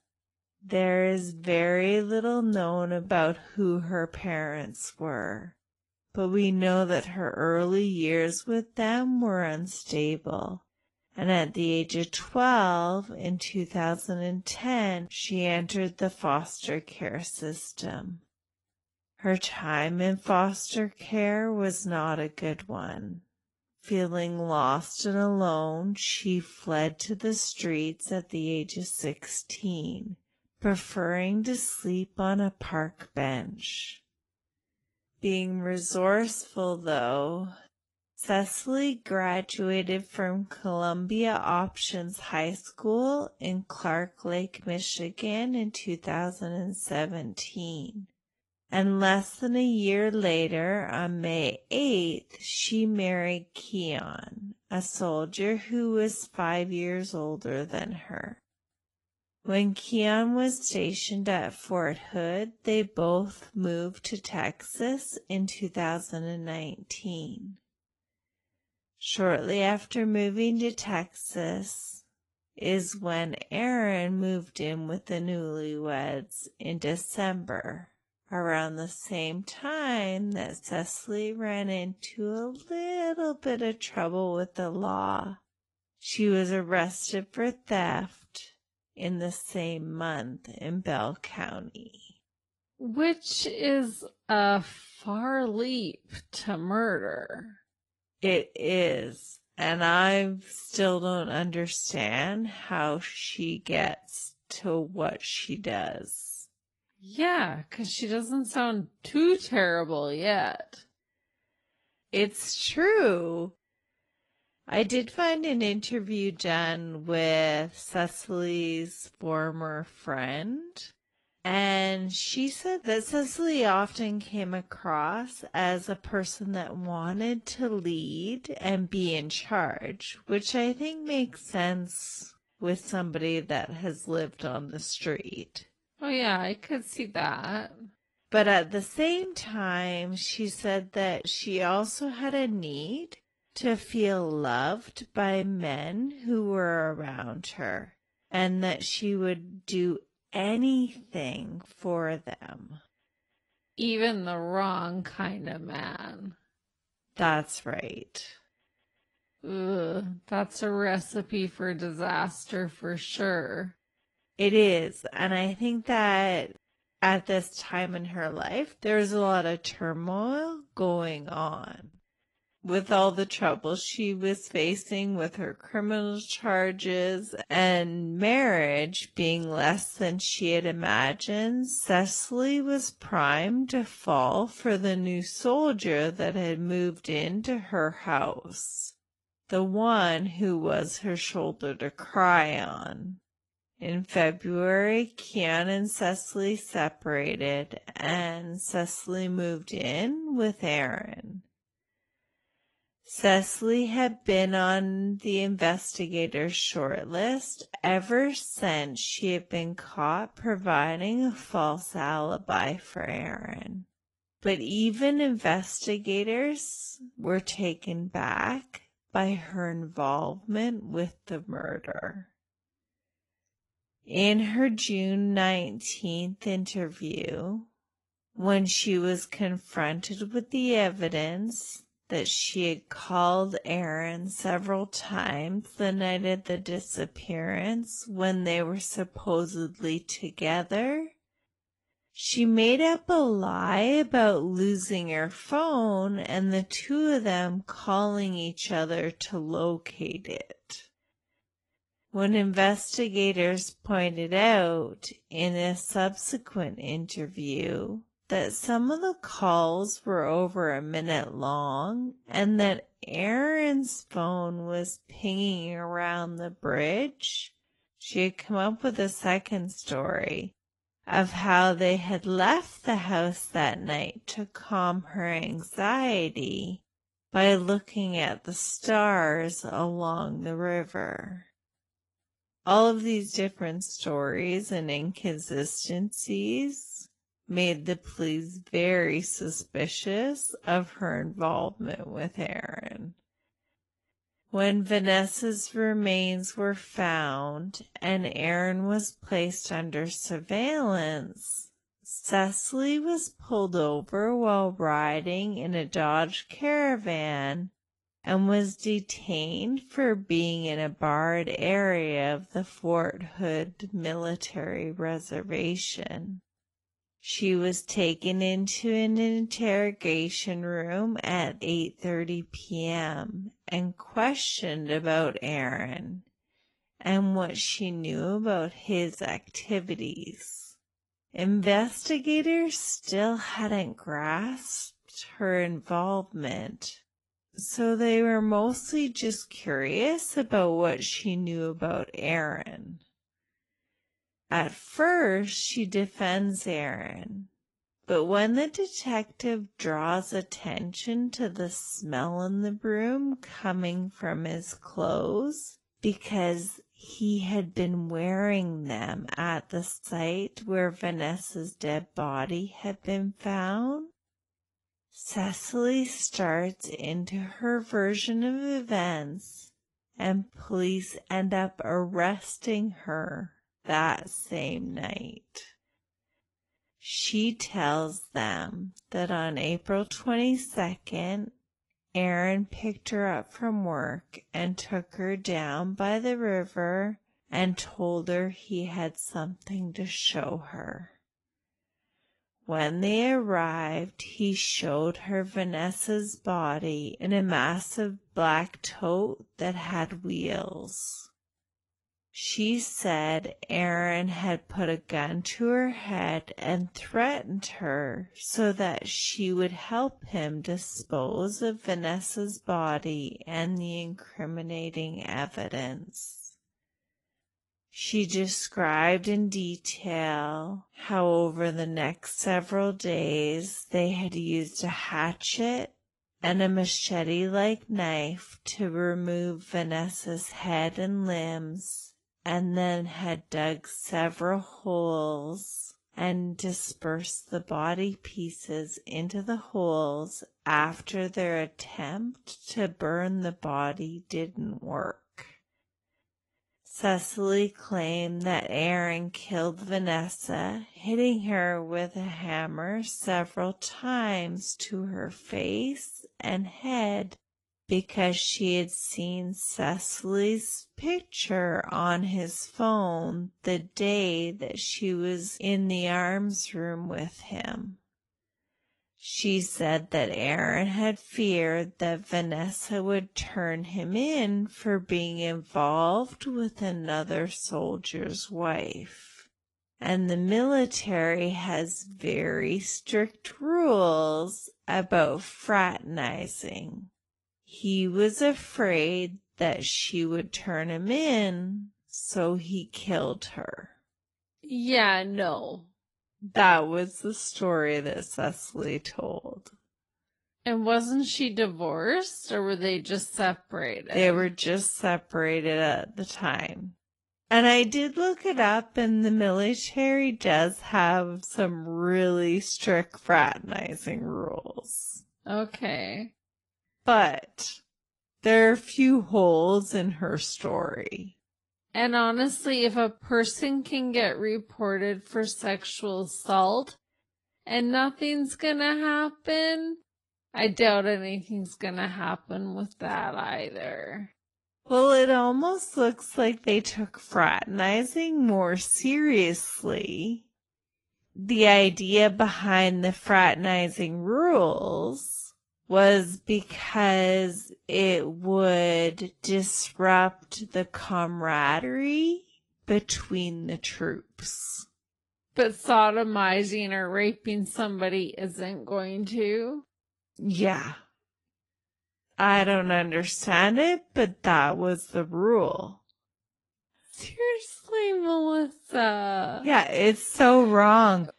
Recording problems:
wrong speed, natural pitch; too slow; 0.5 times normal speed
garbled, watery; slightly; nothing above 11 kHz

